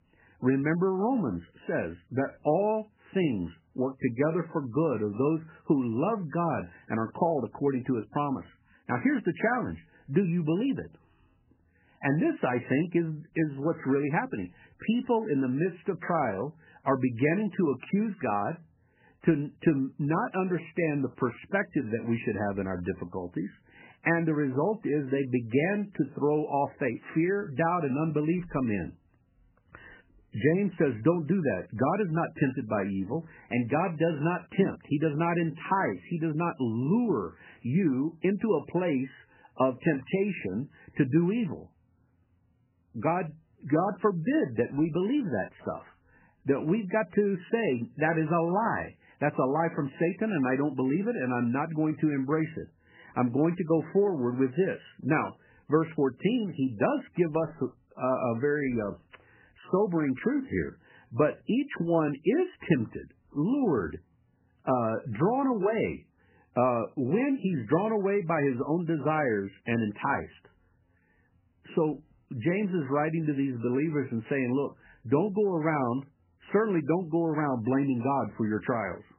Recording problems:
garbled, watery; badly; nothing above 3 kHz

